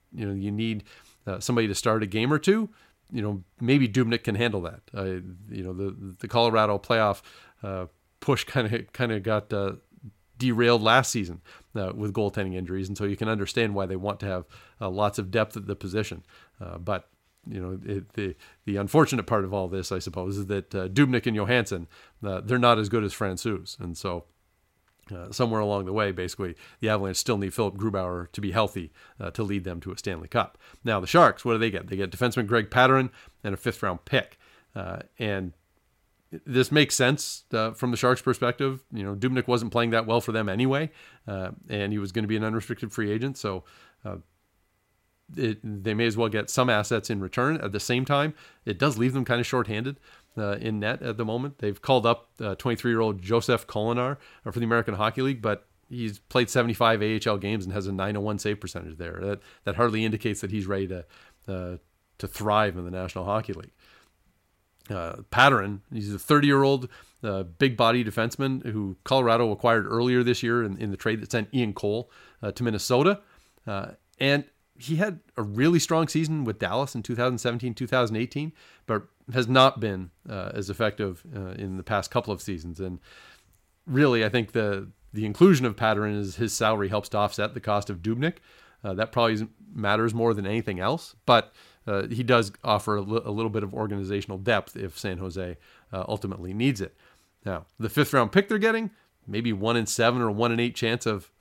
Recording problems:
none

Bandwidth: 16 kHz